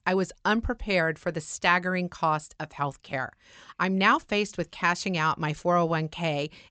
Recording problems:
high frequencies cut off; noticeable; nothing above 8 kHz

